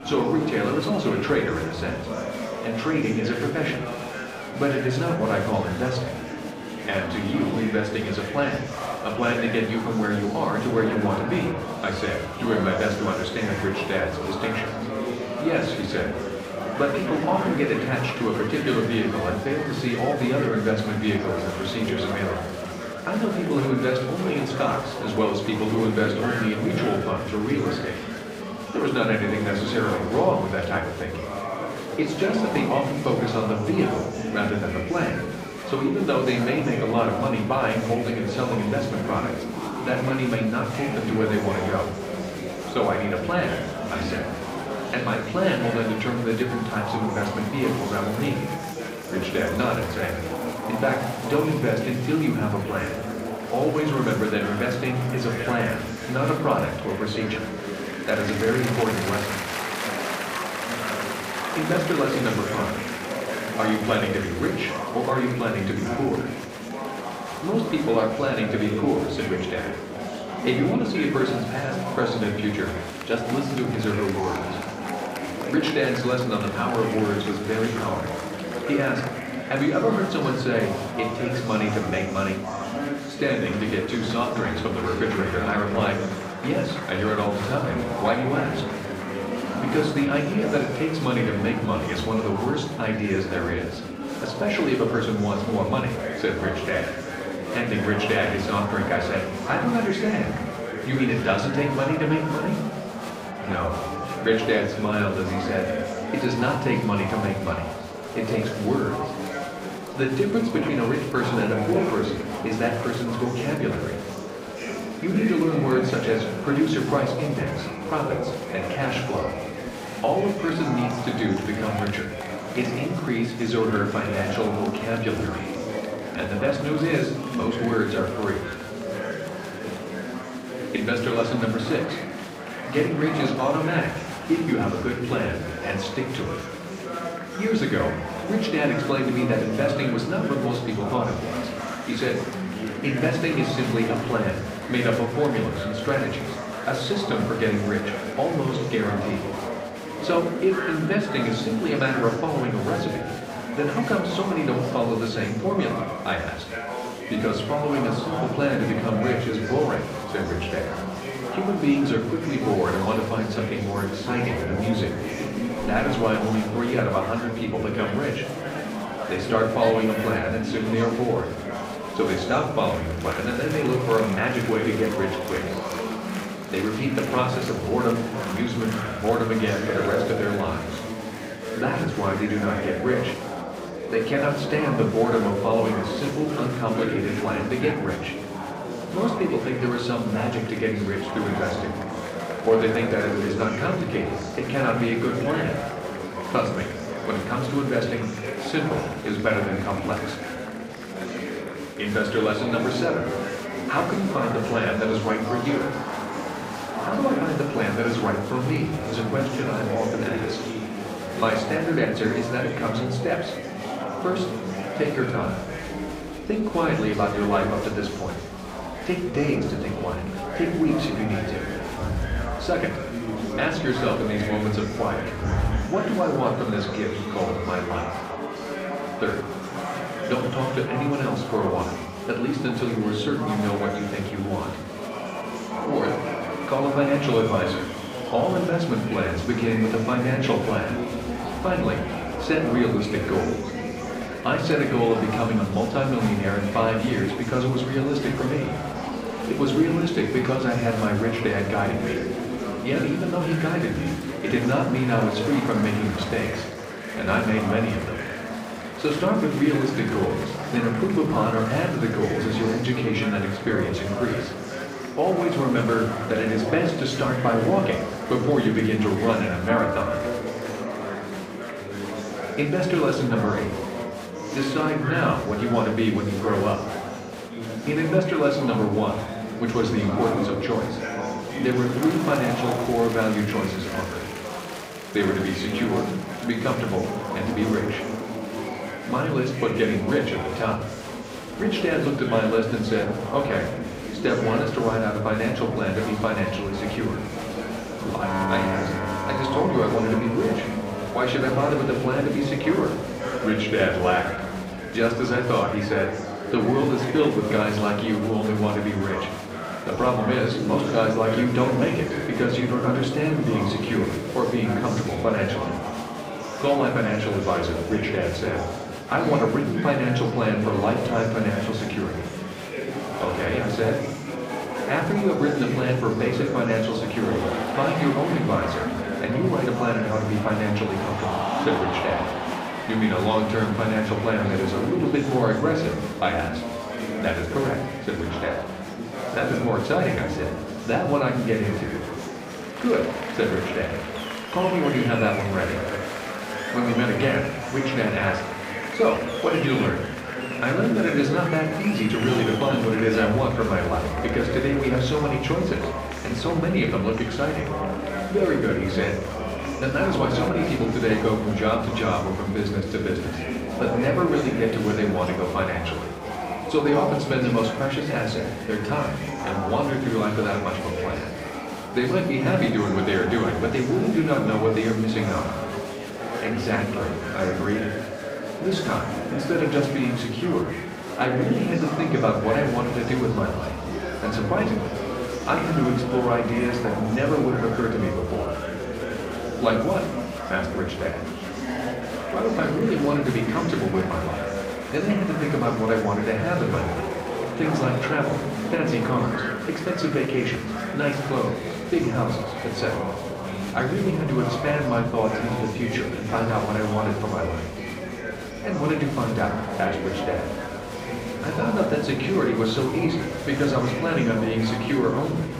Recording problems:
off-mic speech; far
room echo; slight; dies away in 0.6 s
murmuring crowd; loud; throughout; 6 dB below the speech
background music; noticeable; throughout; 15 dB below the speech

